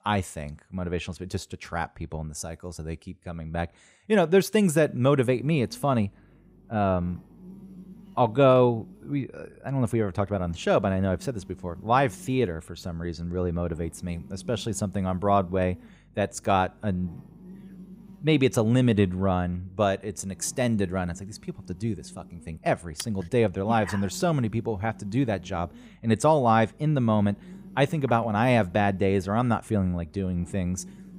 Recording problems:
electrical hum; faint; from 5.5 s on; 50 Hz, 30 dB below the speech

